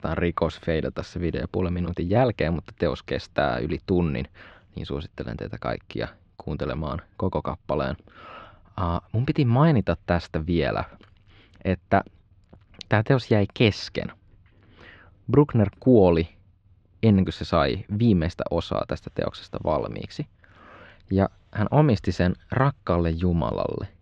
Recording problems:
muffled; slightly; fading above 4 kHz

